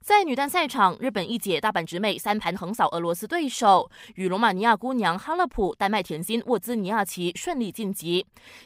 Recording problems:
uneven, jittery; strongly; from 1.5 to 6.5 s

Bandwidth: 15.5 kHz